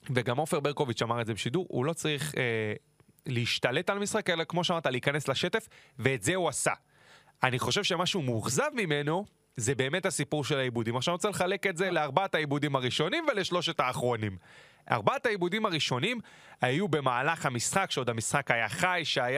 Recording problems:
squashed, flat; somewhat
abrupt cut into speech; at the end

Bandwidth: 15 kHz